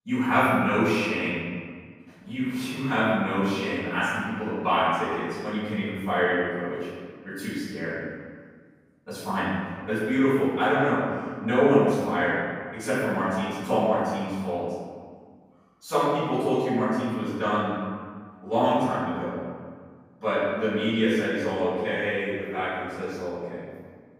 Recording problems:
room echo; strong; dies away in 1.7 s
off-mic speech; far

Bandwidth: 15.5 kHz